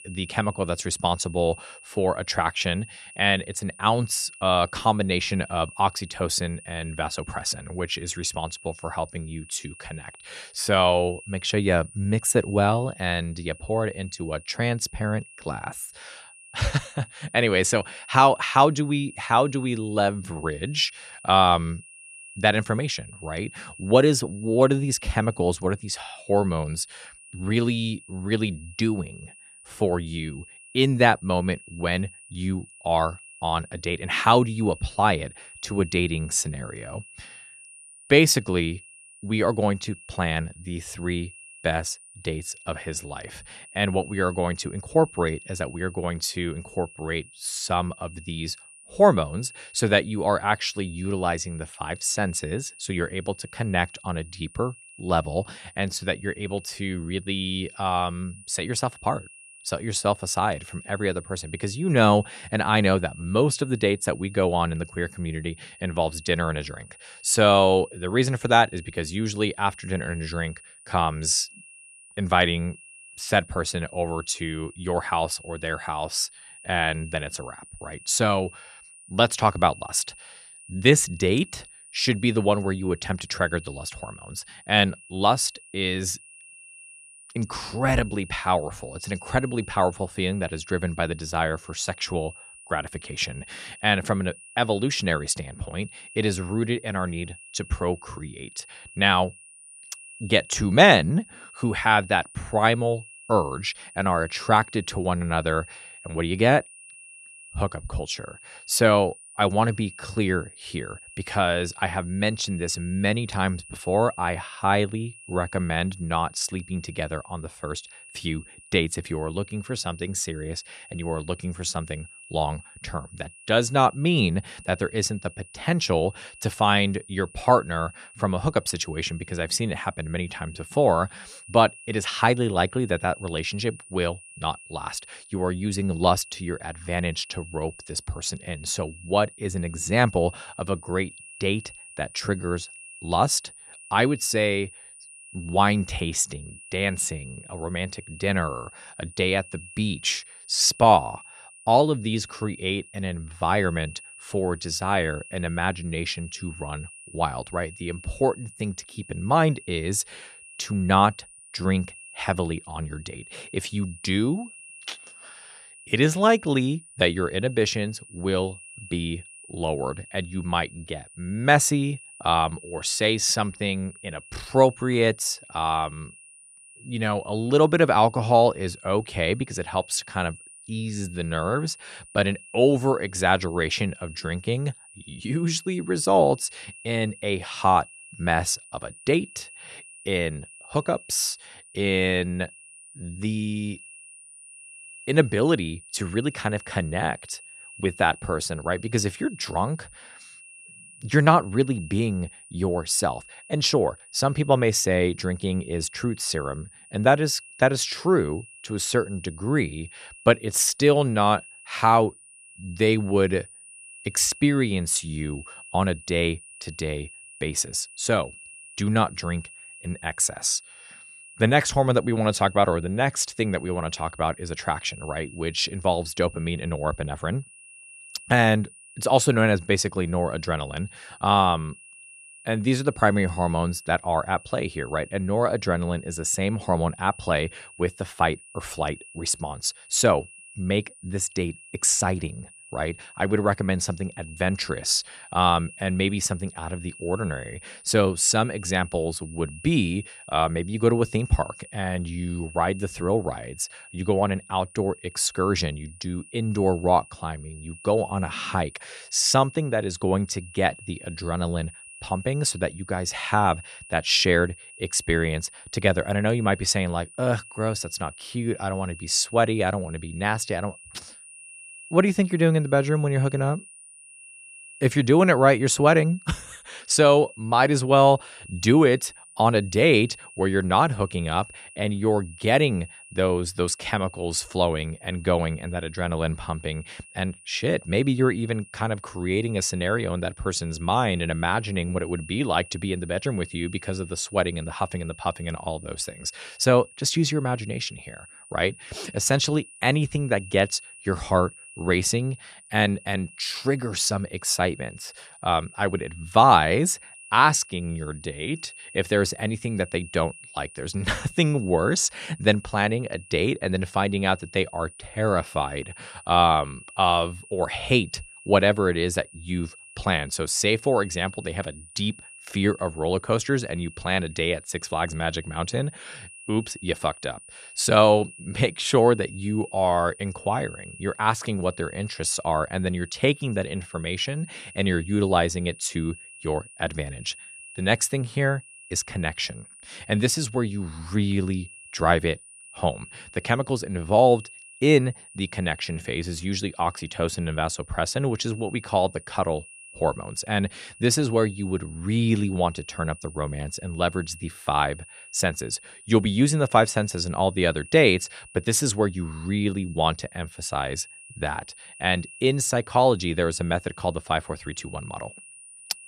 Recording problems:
high-pitched whine; noticeable; throughout; 2.5 kHz, 20 dB below the speech

